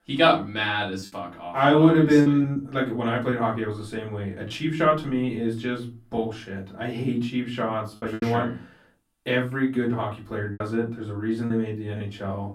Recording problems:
off-mic speech; far
room echo; slight; dies away in 0.3 s
choppy; occasionally; 4% of the speech affected

